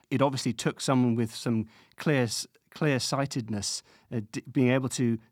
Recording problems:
none

